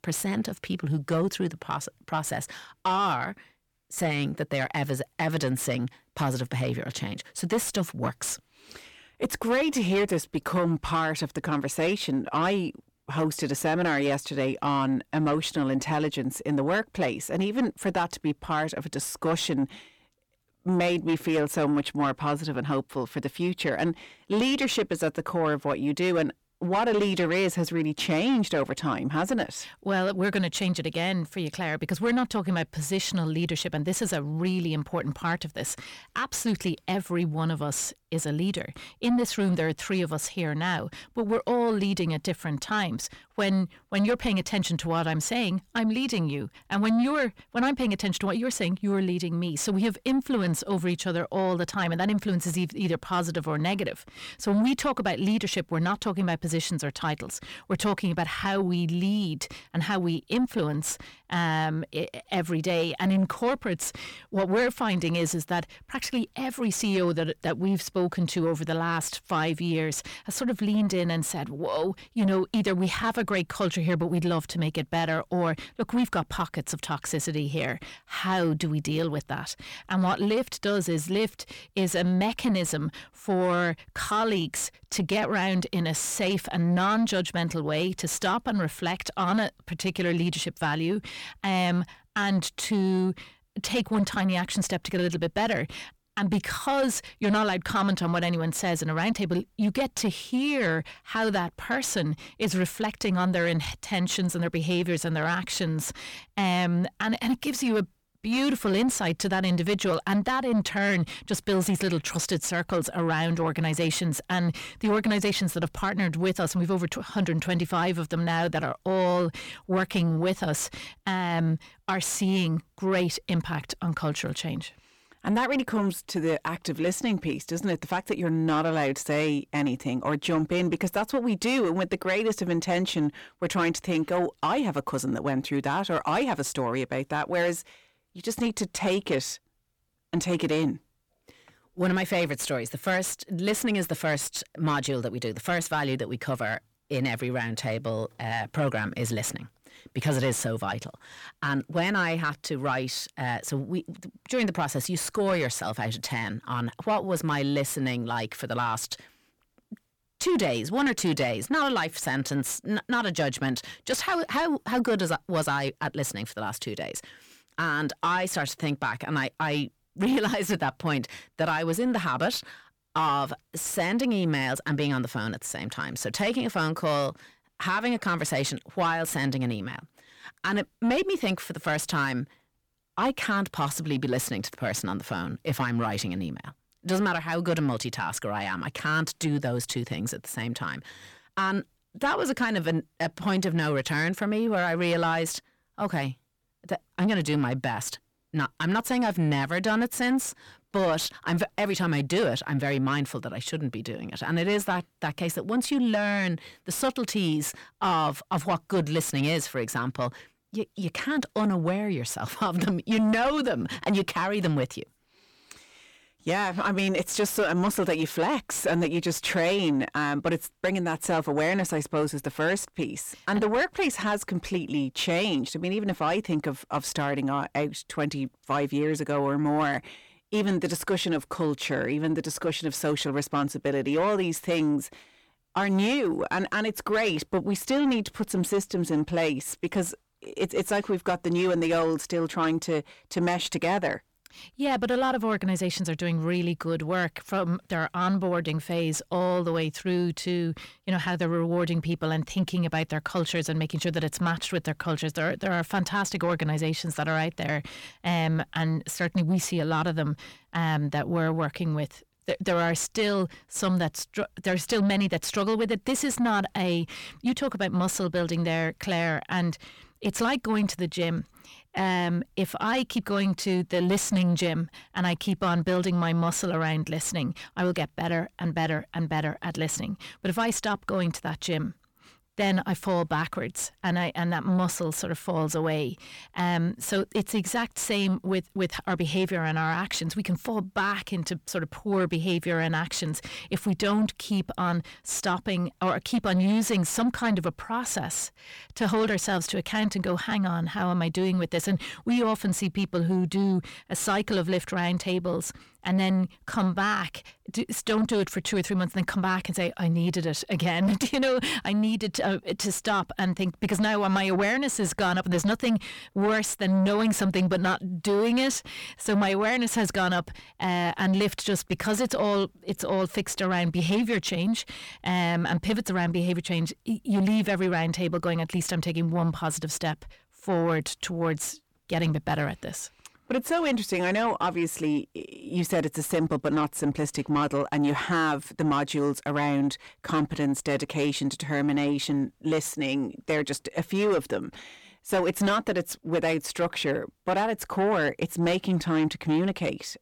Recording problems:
distortion; slight; 10 dB below the speech

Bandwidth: 18.5 kHz